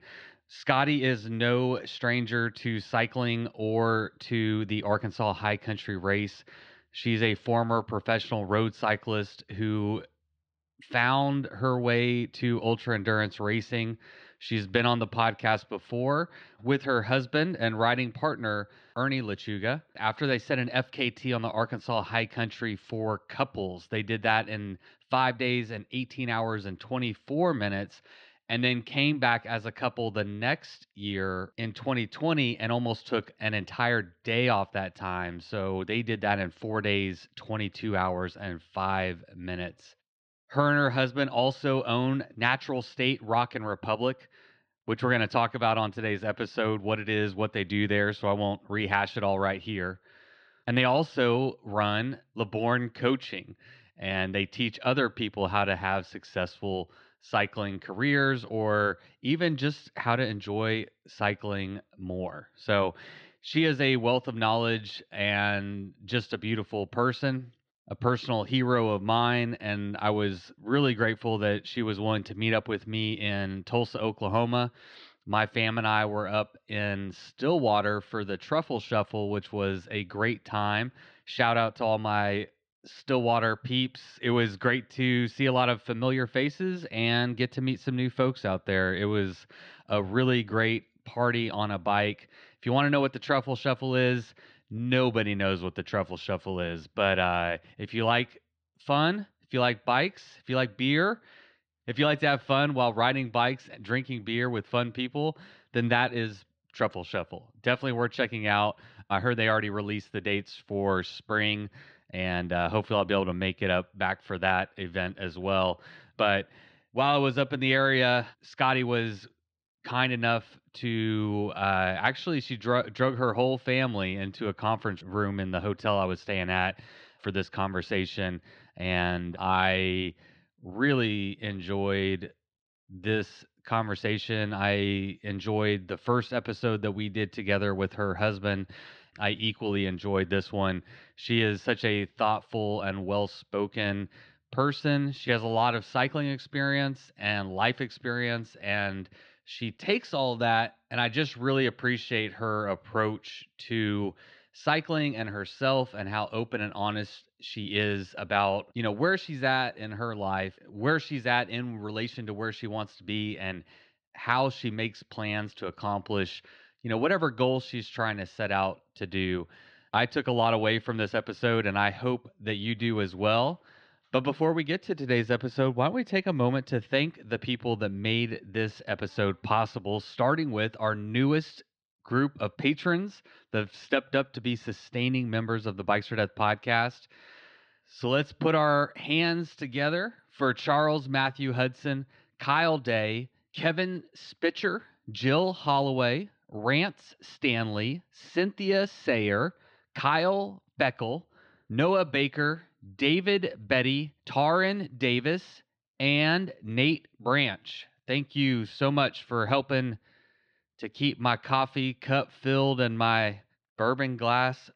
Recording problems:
muffled; very slightly; fading above 4 kHz

